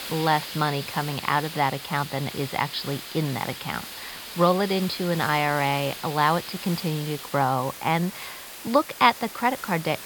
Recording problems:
high frequencies cut off; noticeable; nothing above 5.5 kHz
wind noise on the microphone; occasional gusts; 15 dB below the speech
hiss; noticeable; throughout; 15 dB below the speech

